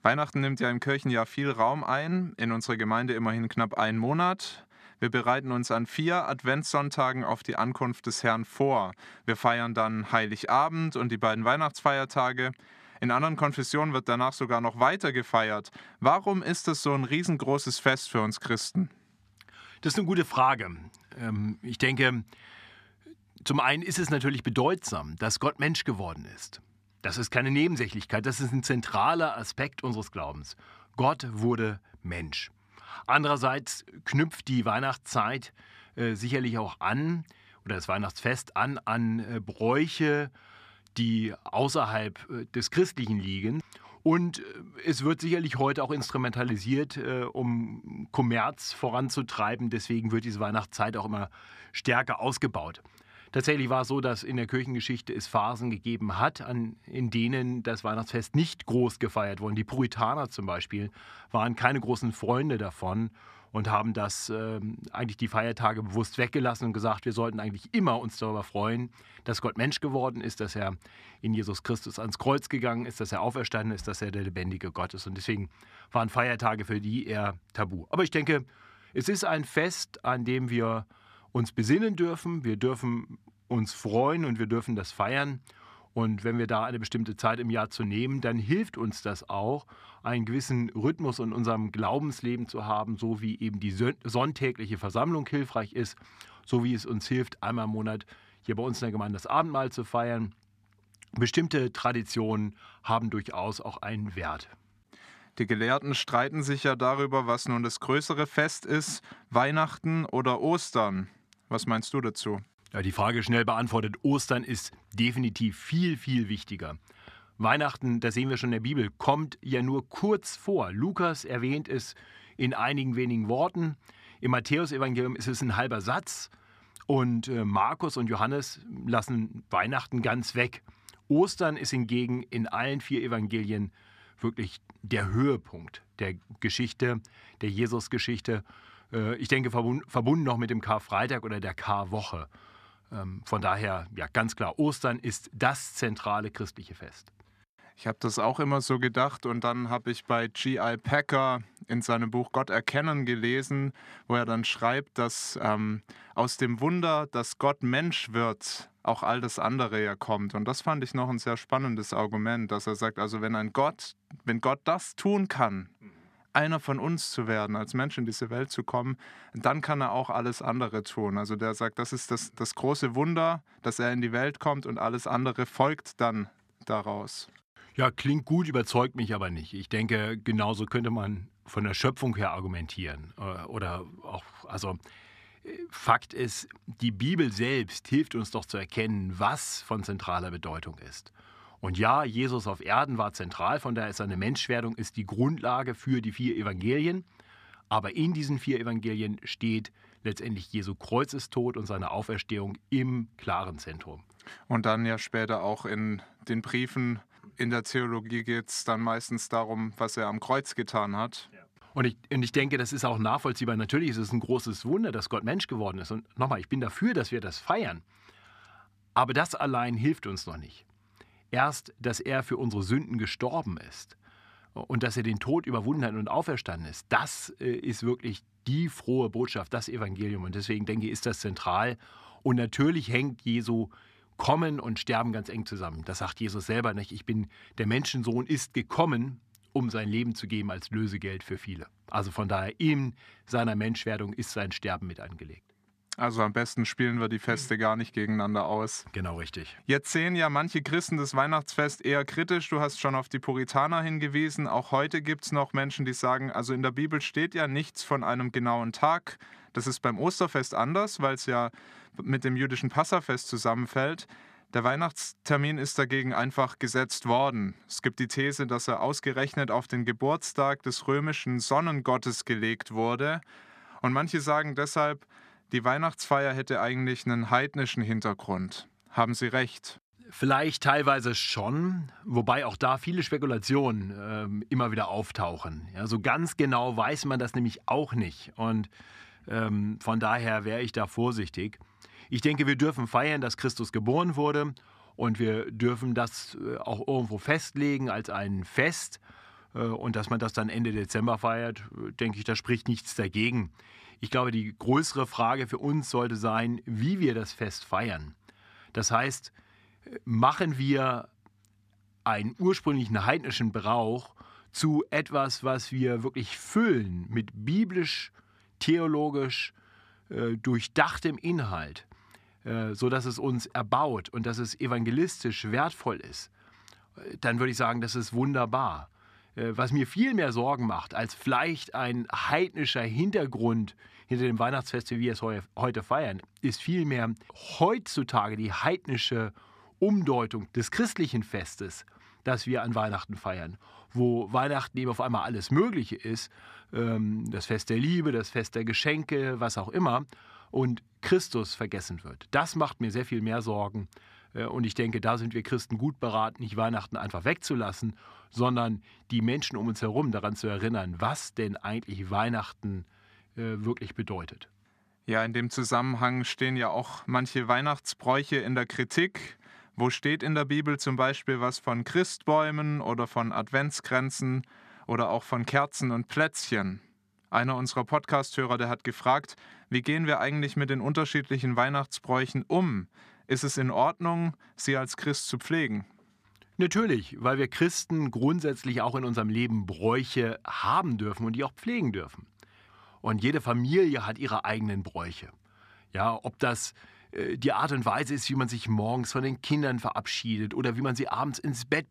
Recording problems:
none

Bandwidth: 14.5 kHz